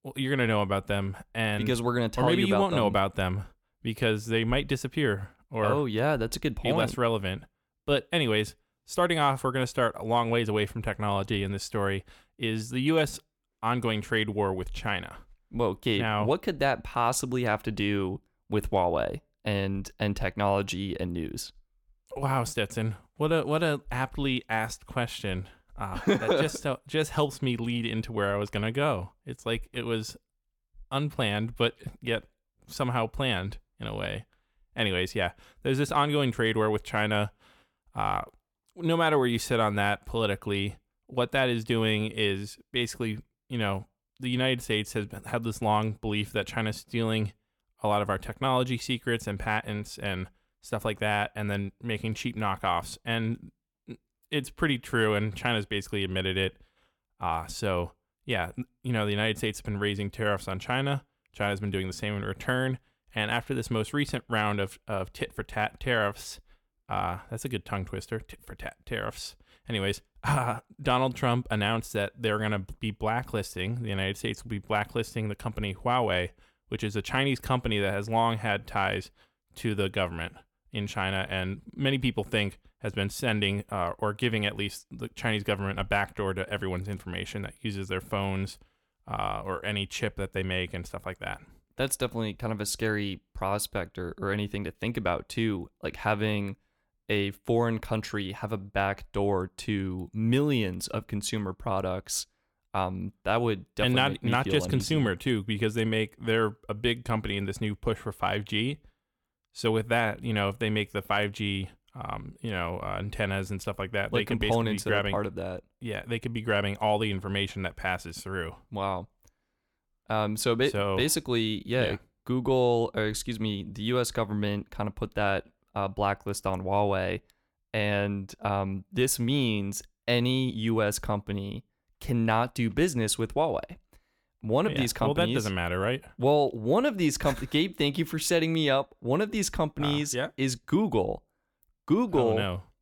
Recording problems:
none

